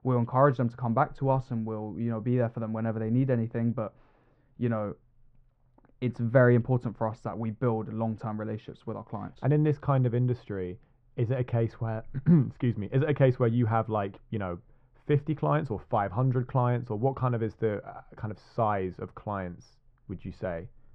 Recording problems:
muffled; very; fading above 1 kHz

